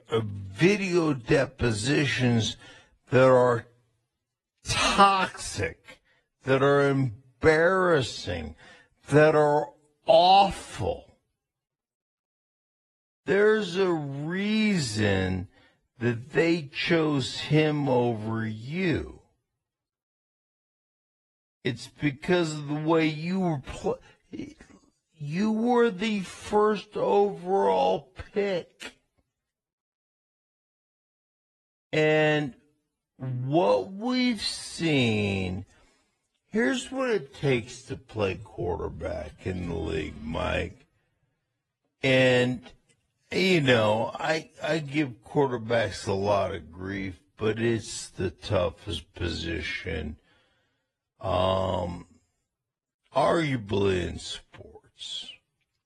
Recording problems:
wrong speed, natural pitch; too slow; 0.5 times normal speed
garbled, watery; slightly

